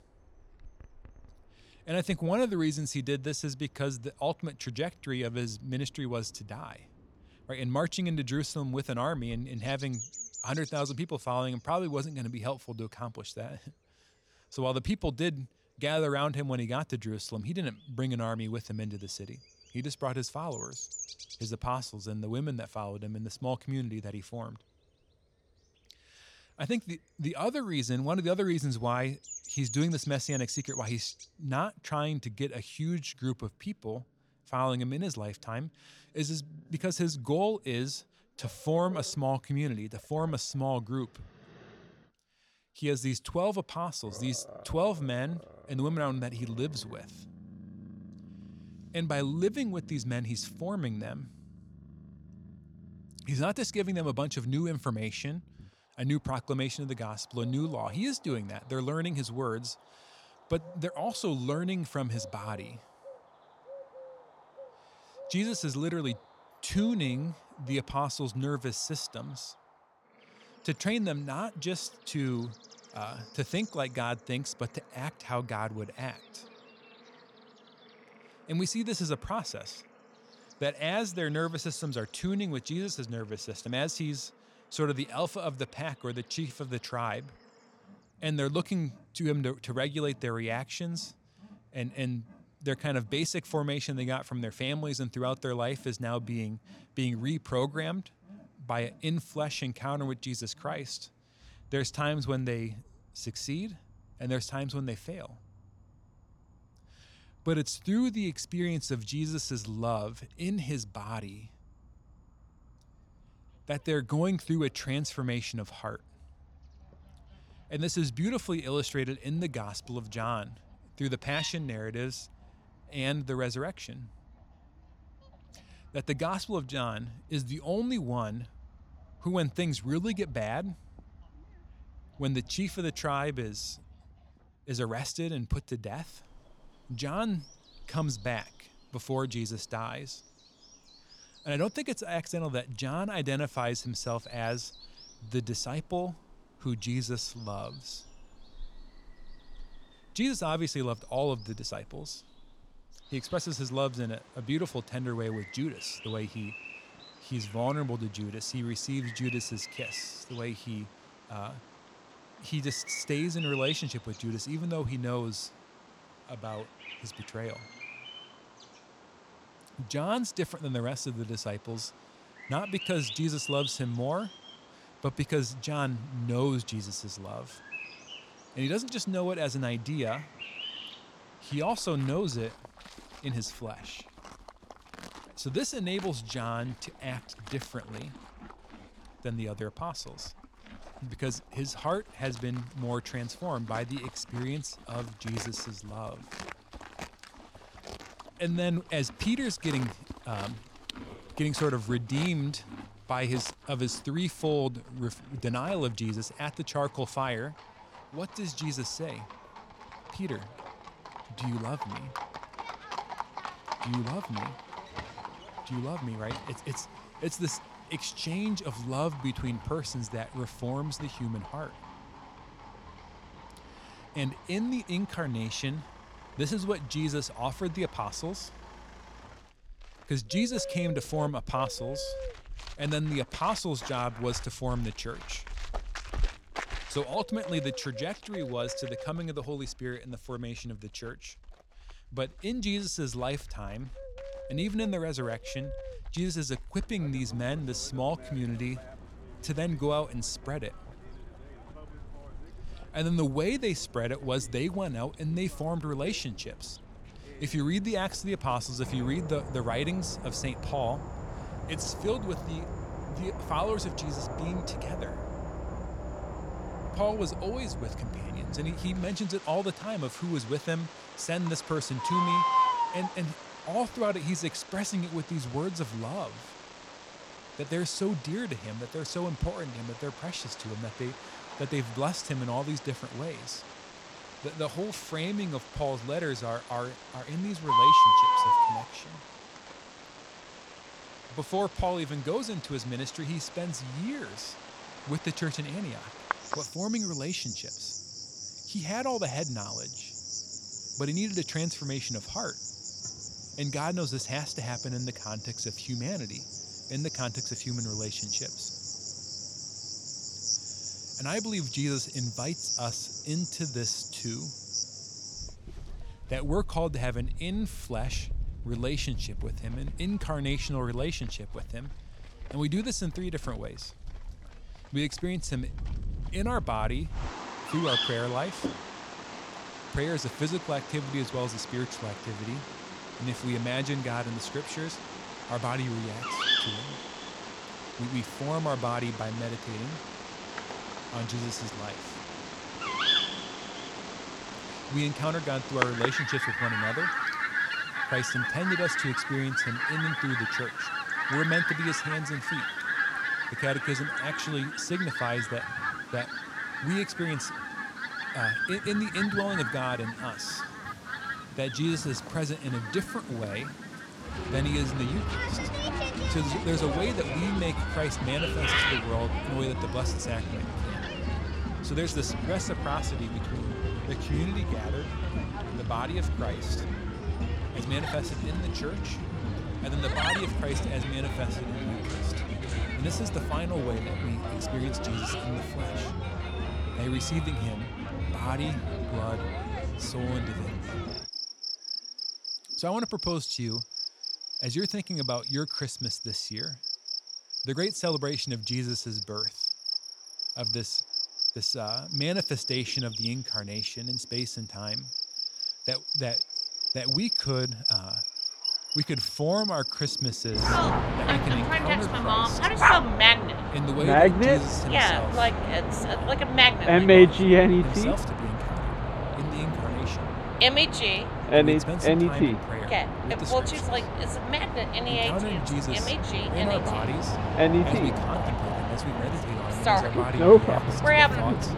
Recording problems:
animal sounds; very loud; throughout; 4 dB above the speech

